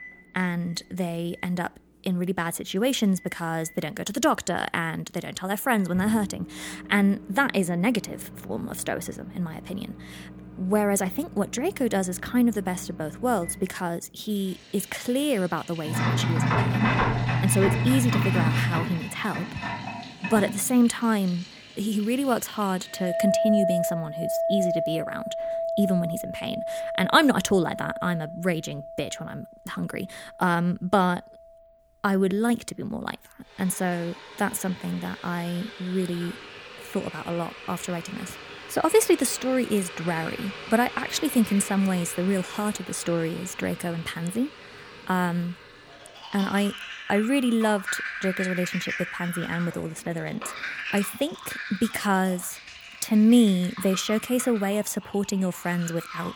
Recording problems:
household noises; loud; throughout; 5 dB below the speech

